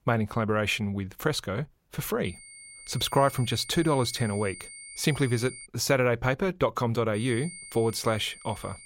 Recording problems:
high-pitched whine; noticeable; from 2.5 to 5.5 s and from 7 s on; 9 kHz, 15 dB below the speech

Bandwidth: 16 kHz